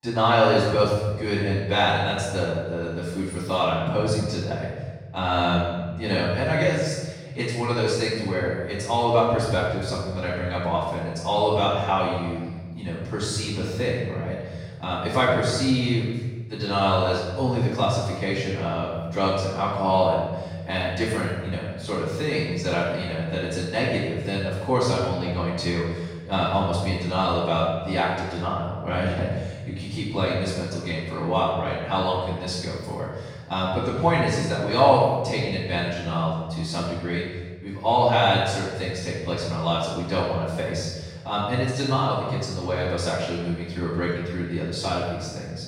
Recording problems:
room echo; strong; dies away in 1.5 s
off-mic speech; far

